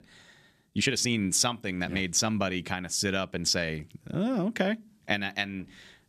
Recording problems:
uneven, jittery; strongly; from 0.5 to 4.5 s

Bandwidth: 14.5 kHz